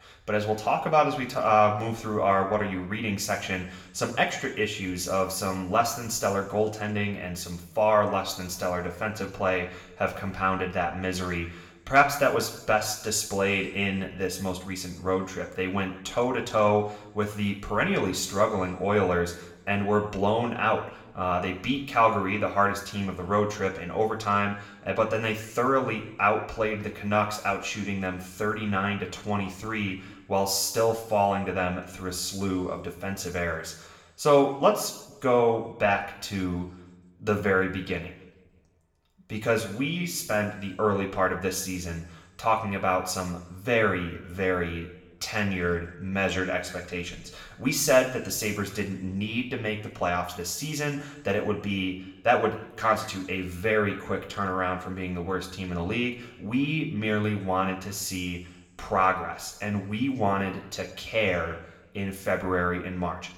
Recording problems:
room echo; slight; dies away in 0.8 s
off-mic speech; somewhat distant

